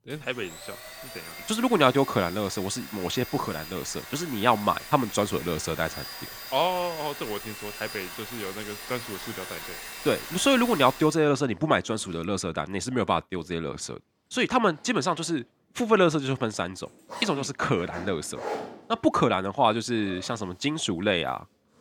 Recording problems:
household noises; noticeable; throughout; 10 dB below the speech

